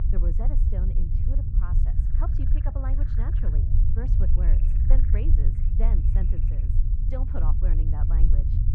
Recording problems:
muffled; very; fading above 1.5 kHz
low rumble; loud; throughout; 1 dB below the speech
animal sounds; noticeable; from 2 s on; 20 dB below the speech

